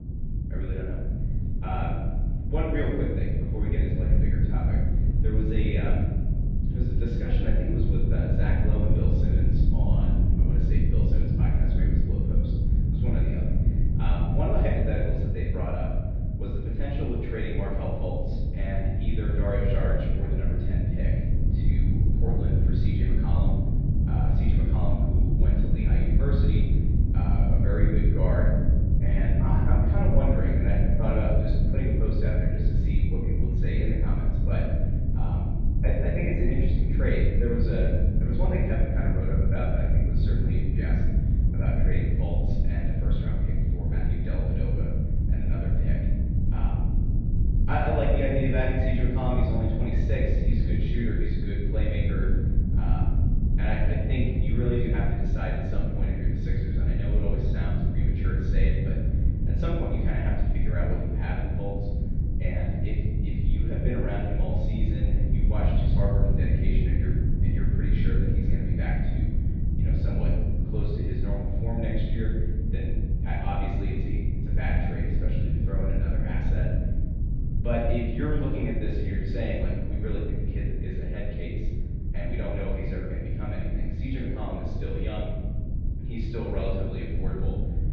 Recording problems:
room echo; strong; dies away in 1 s
off-mic speech; far
muffled; very; fading above 4 kHz
low rumble; loud; throughout; 4 dB below the speech

